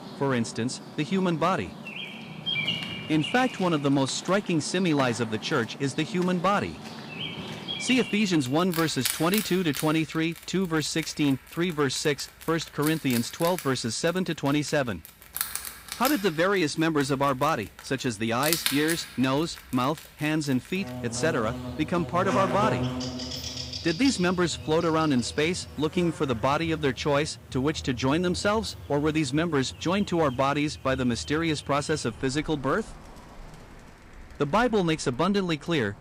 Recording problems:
animal sounds; loud; throughout; 9 dB below the speech

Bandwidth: 15.5 kHz